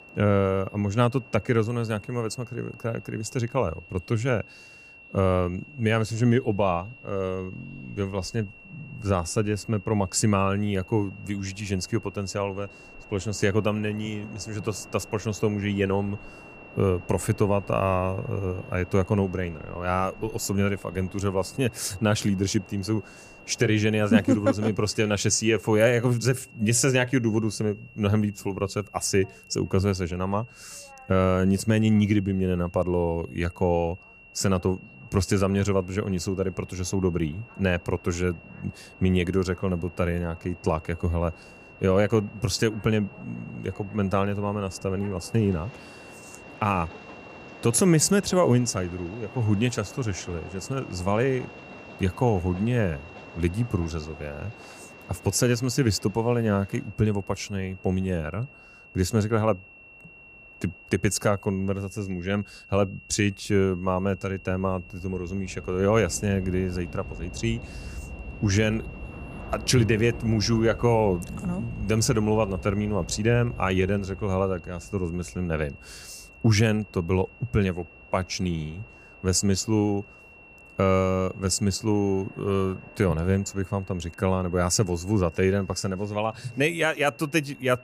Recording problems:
high-pitched whine; faint; throughout; 2.5 kHz, 20 dB below the speech
train or aircraft noise; faint; throughout; 20 dB below the speech

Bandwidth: 15 kHz